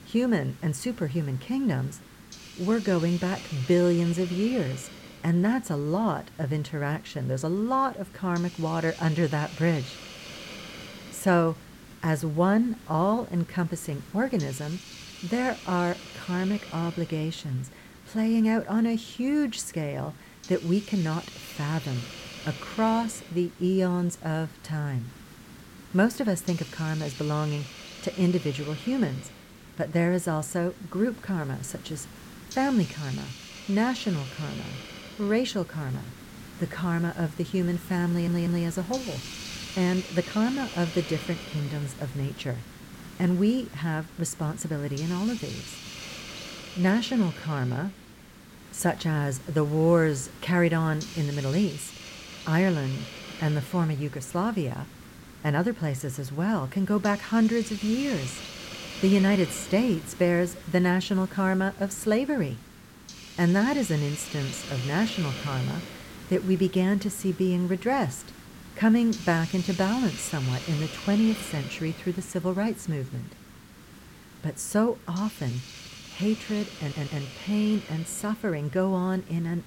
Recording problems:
hiss; noticeable; throughout; 15 dB below the speech
audio stuttering; at 38 s and at 1:17

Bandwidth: 16.5 kHz